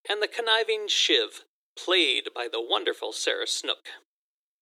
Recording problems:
thin; very; fading below 300 Hz

